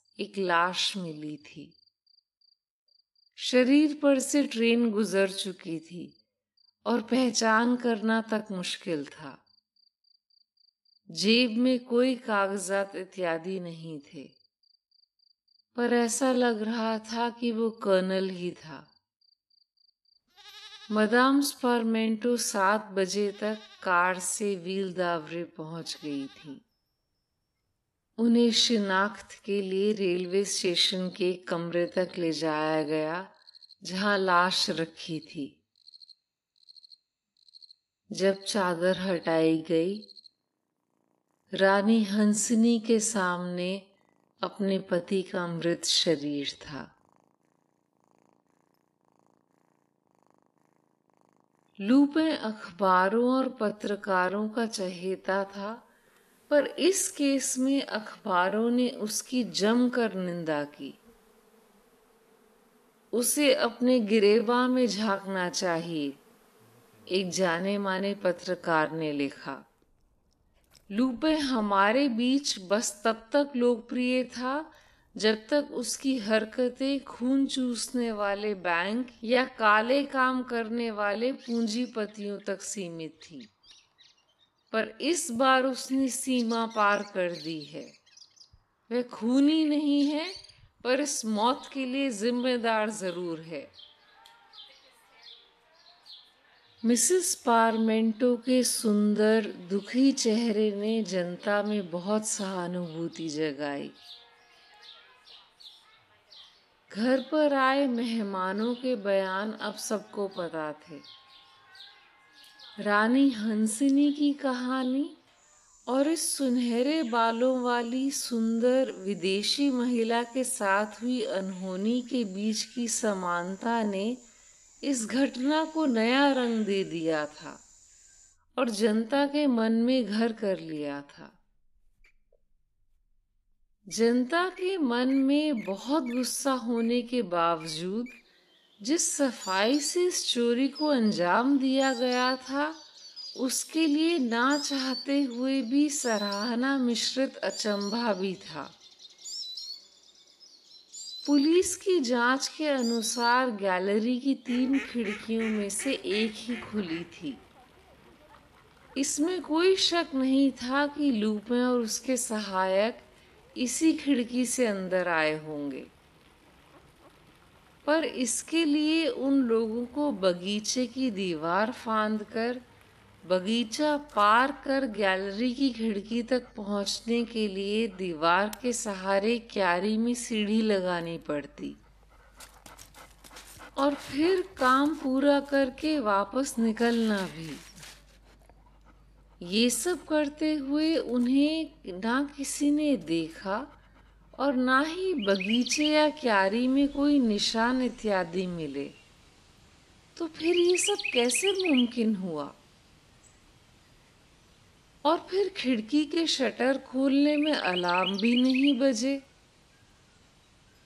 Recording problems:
wrong speed, natural pitch; too slow; 0.6 times normal speed
animal sounds; noticeable; throughout; 15 dB below the speech

